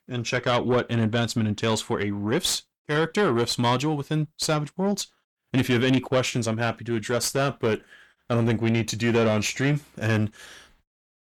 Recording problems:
distortion; slight; 10 dB below the speech

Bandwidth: 18.5 kHz